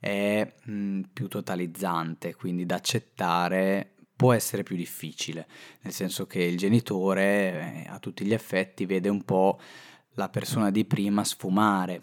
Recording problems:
none

